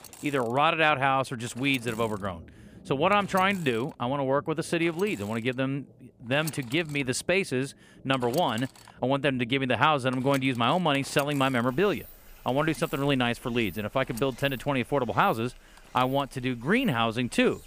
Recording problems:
machinery noise; faint; throughout; 20 dB below the speech
rain or running water; faint; throughout; 25 dB below the speech

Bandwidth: 15 kHz